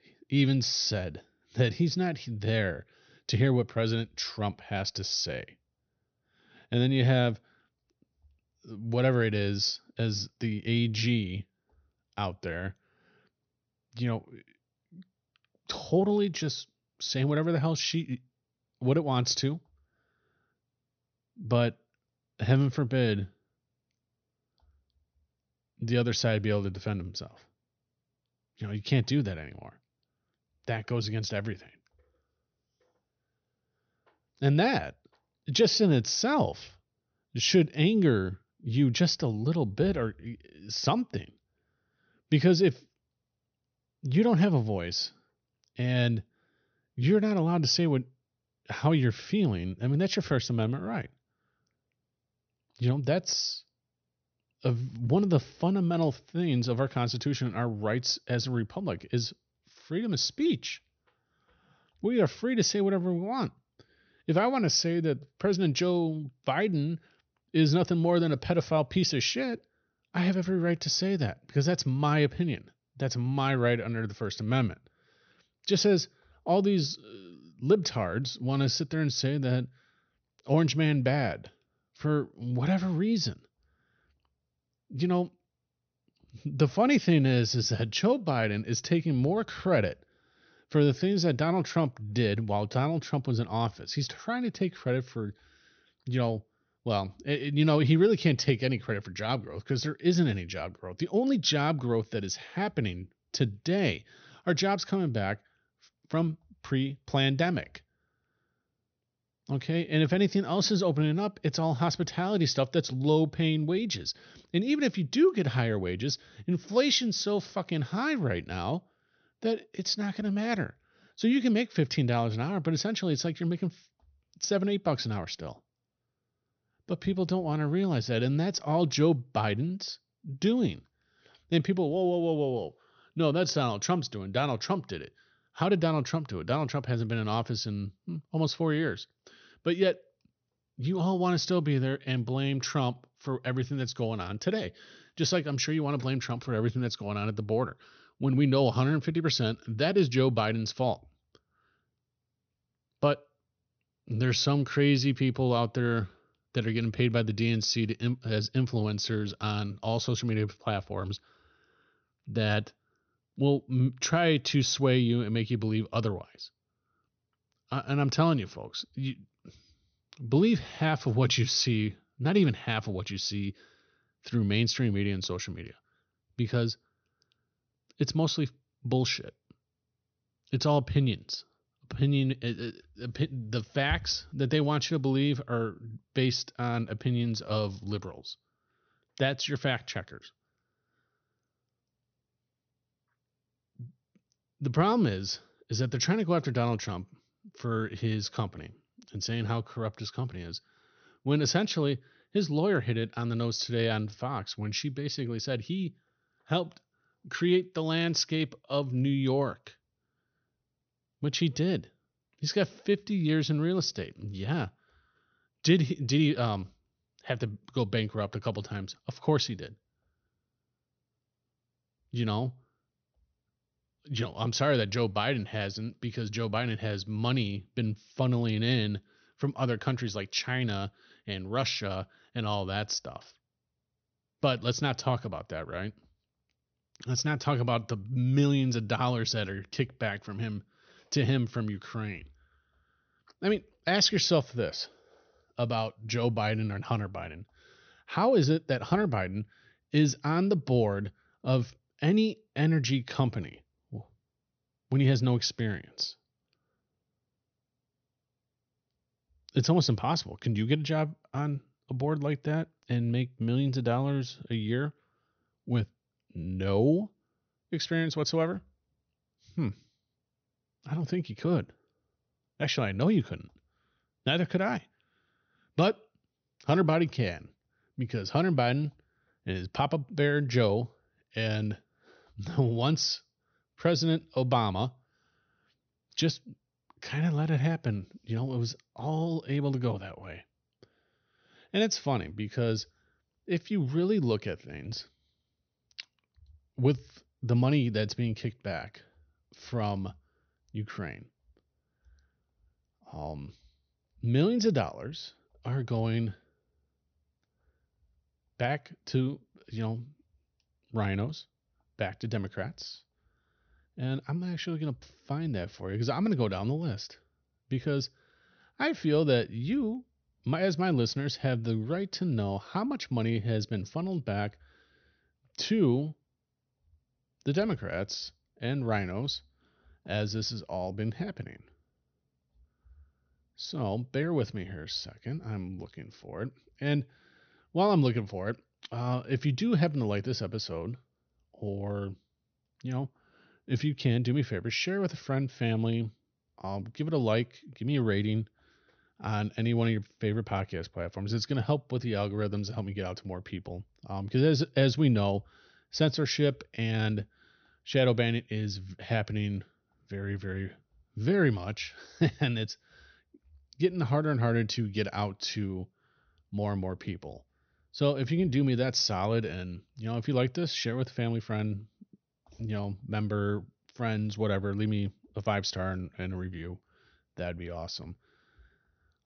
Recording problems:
high frequencies cut off; noticeable; nothing above 6 kHz

